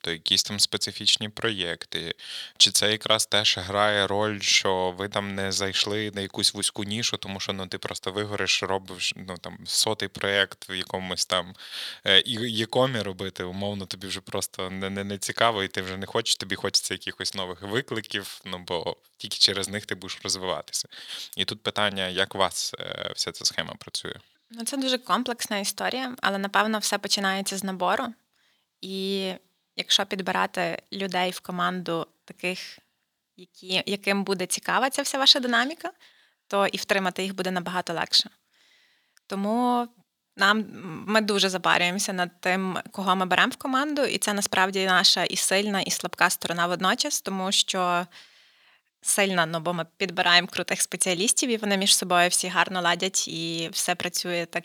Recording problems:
thin; somewhat; fading below 1 kHz

